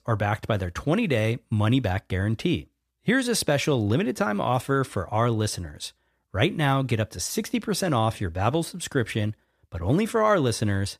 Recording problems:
none

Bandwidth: 14.5 kHz